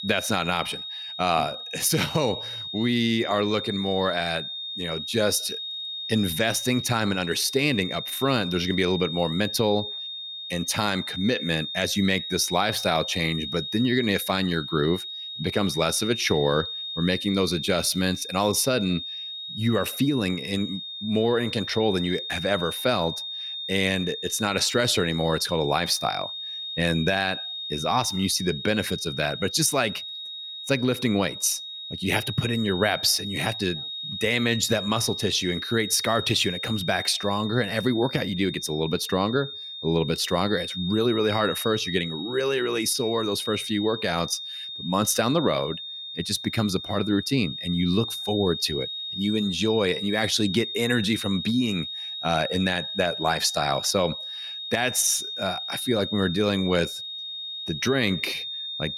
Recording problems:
high-pitched whine; loud; throughout; 3.5 kHz, 6 dB below the speech

